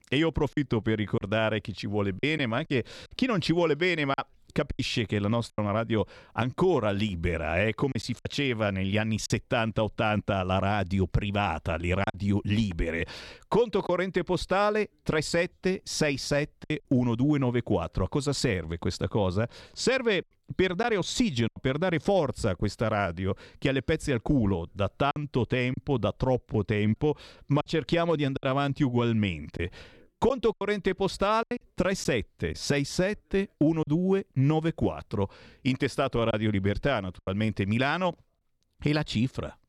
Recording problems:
choppy; occasionally; 4% of the speech affected

